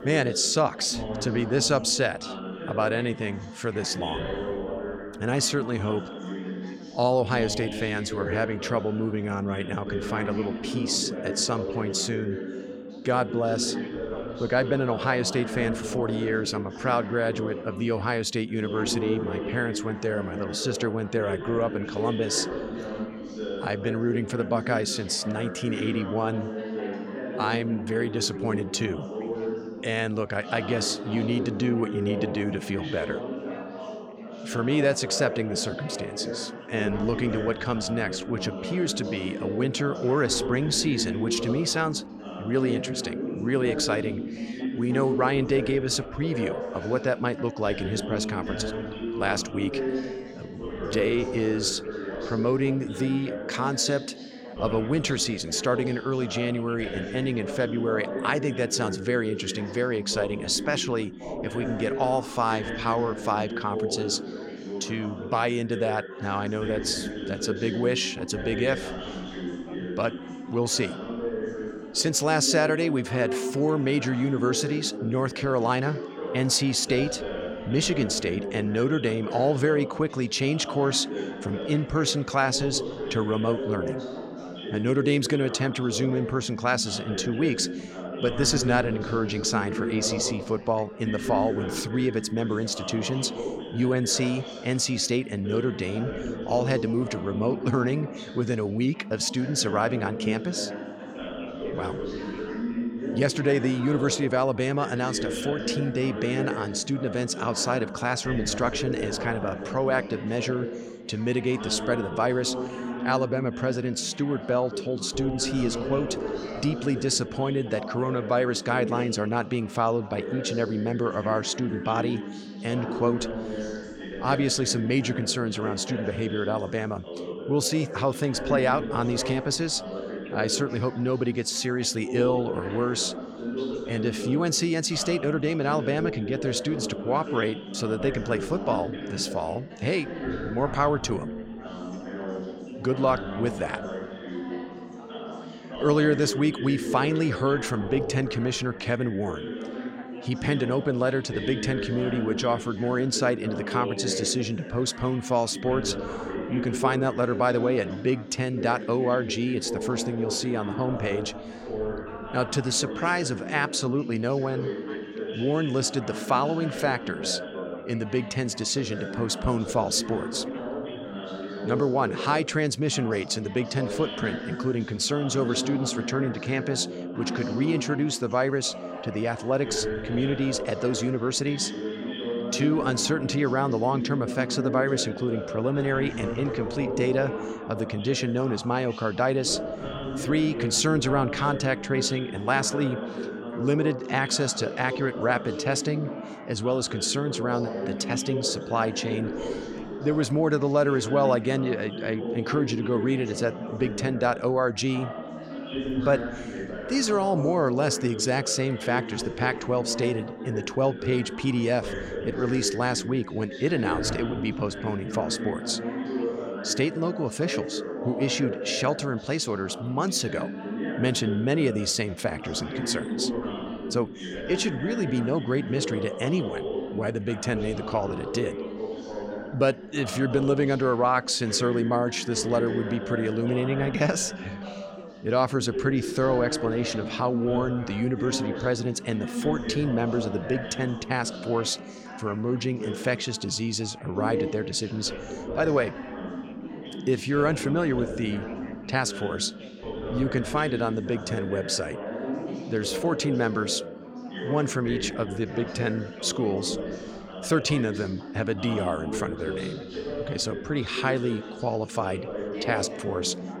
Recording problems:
background chatter; loud; throughout; 4 voices, 7 dB below the speech

